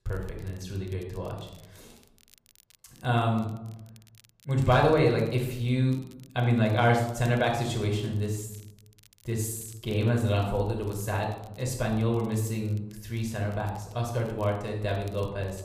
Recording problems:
room echo; noticeable; dies away in 0.7 s
off-mic speech; somewhat distant
crackle, like an old record; faint; 30 dB below the speech

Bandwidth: 15 kHz